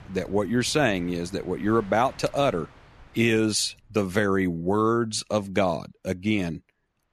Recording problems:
train or aircraft noise; faint; throughout; 25 dB below the speech

